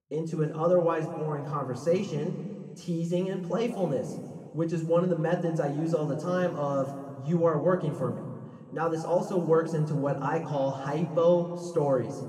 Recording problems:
muffled; very; fading above 1.5 kHz
room echo; noticeable; dies away in 1.7 s
off-mic speech; somewhat distant

